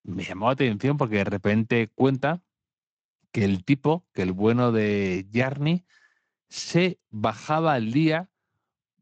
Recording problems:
garbled, watery; slightly; nothing above 7.5 kHz

